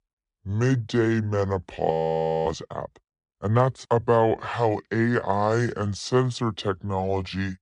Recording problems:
wrong speed and pitch; too slow and too low; 0.7 times normal speed
audio freezing; at 2 s for 0.5 s

